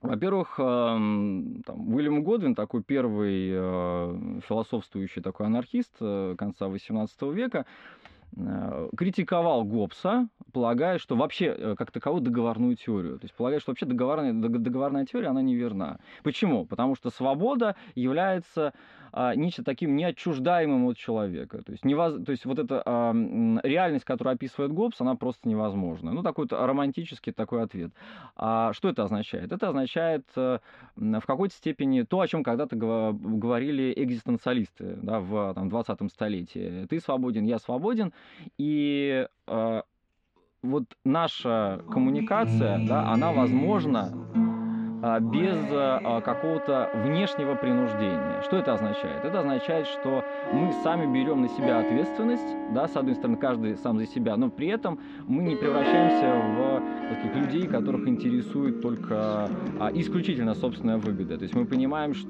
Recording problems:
muffled; very; fading above 3 kHz
background music; loud; from 42 s on; 3 dB below the speech

